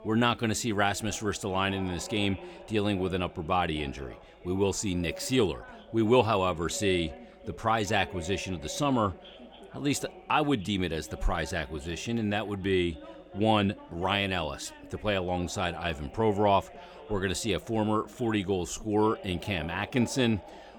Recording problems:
background chatter; noticeable; throughout; 2 voices, 20 dB below the speech

